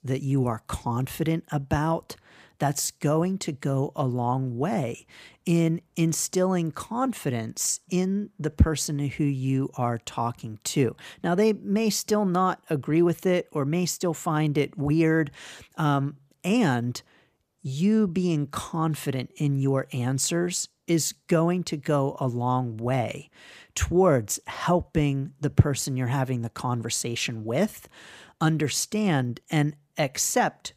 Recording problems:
none

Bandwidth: 14.5 kHz